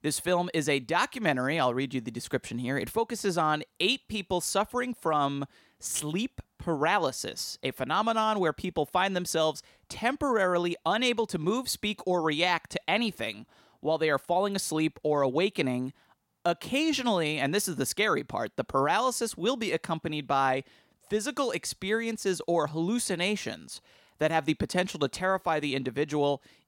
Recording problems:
none

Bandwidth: 16.5 kHz